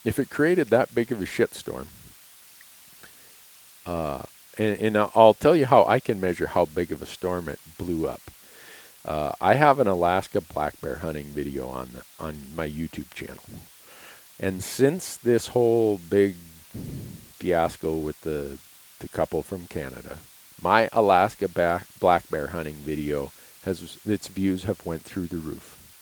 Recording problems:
garbled, watery; slightly
hiss; faint; throughout; 25 dB below the speech

